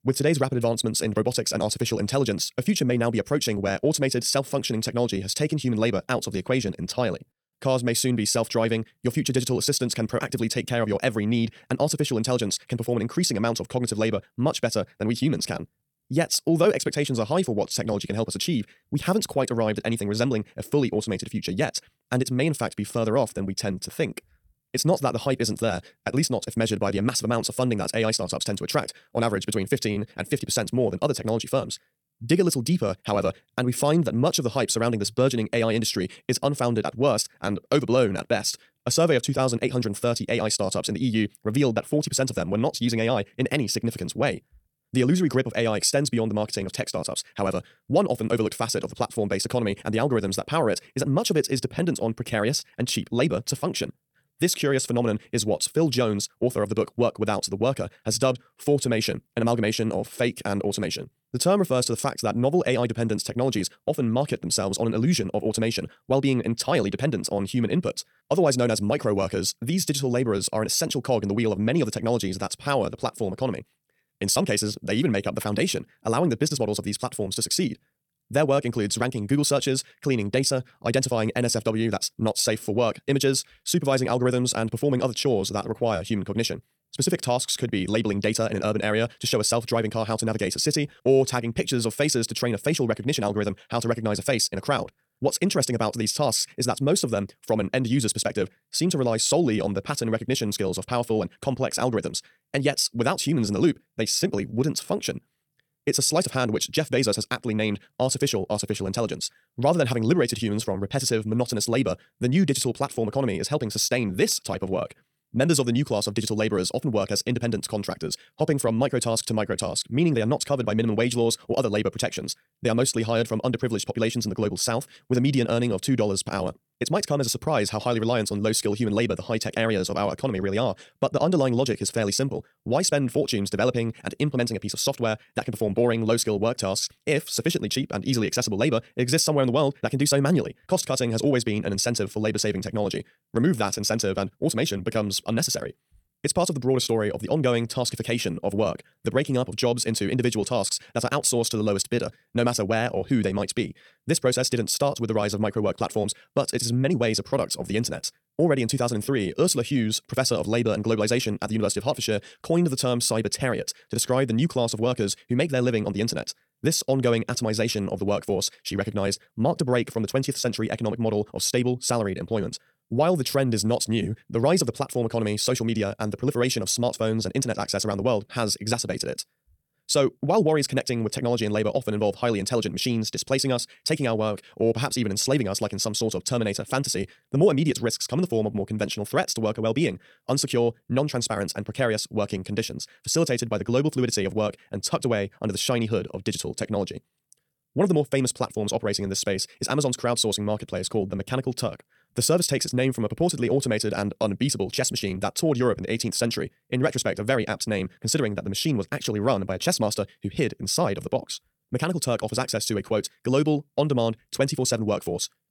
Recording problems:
wrong speed, natural pitch; too fast; 1.7 times normal speed

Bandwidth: 18 kHz